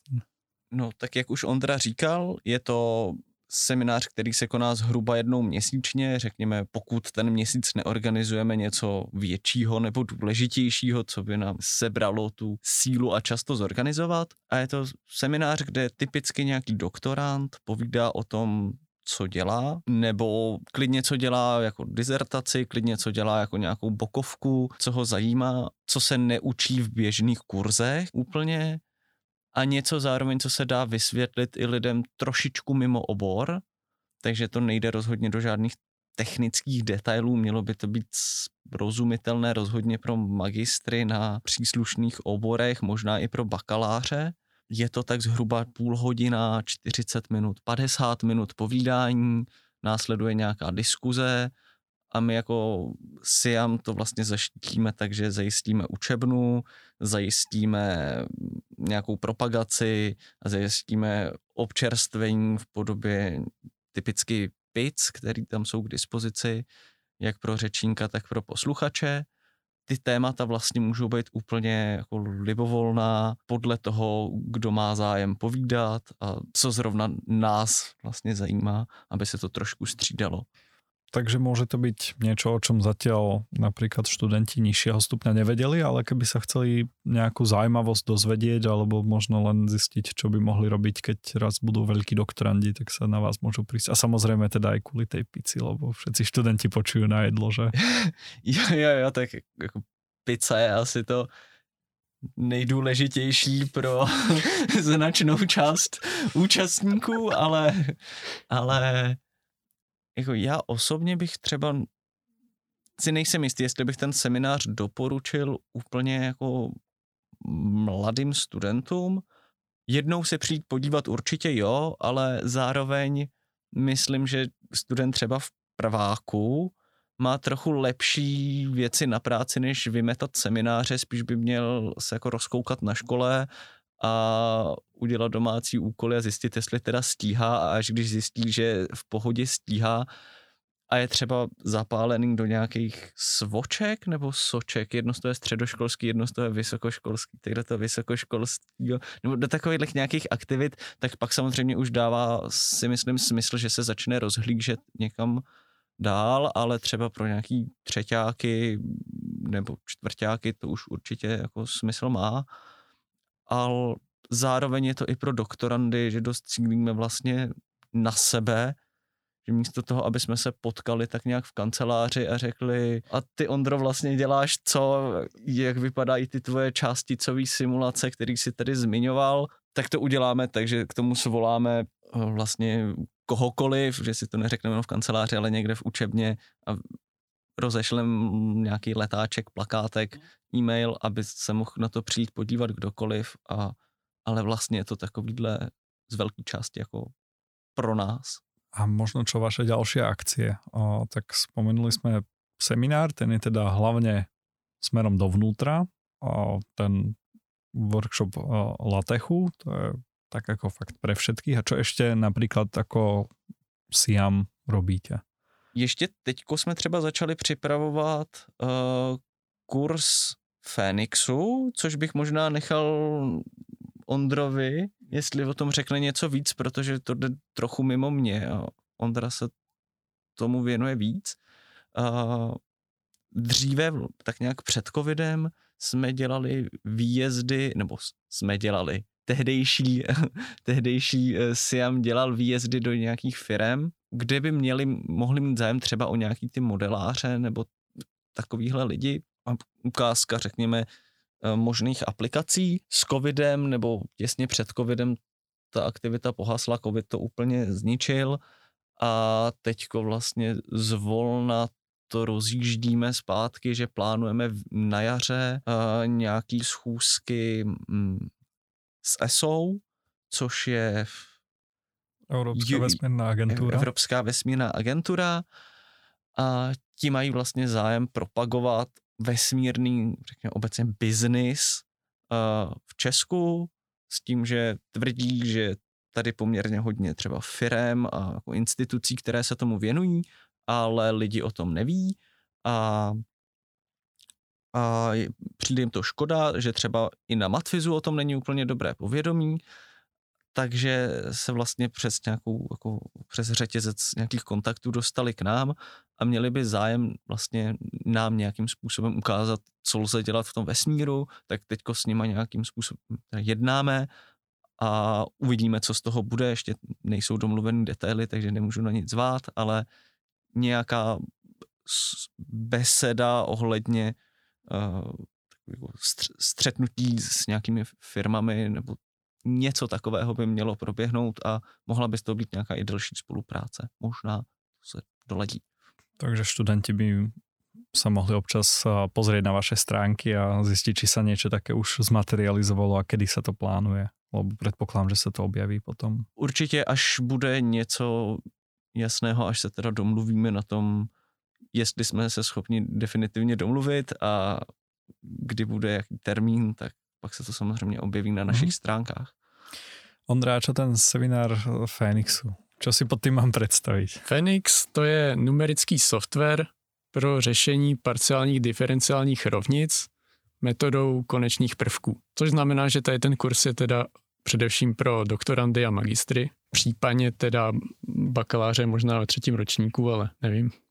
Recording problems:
none

